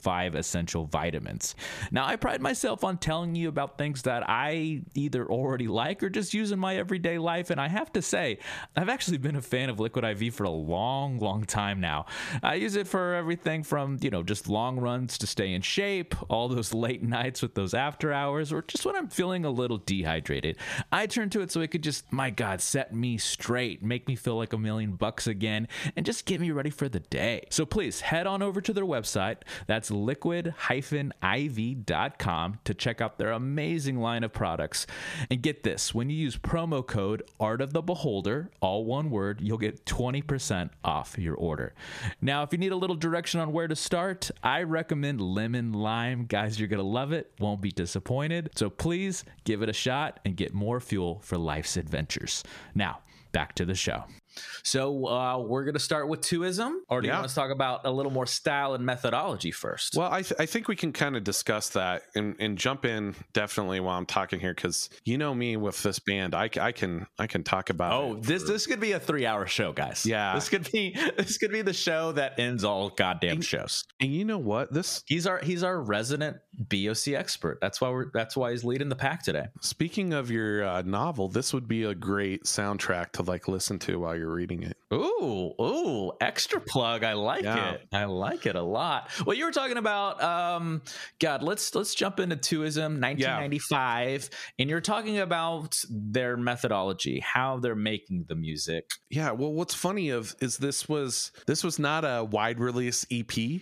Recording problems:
squashed, flat; heavily

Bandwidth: 14.5 kHz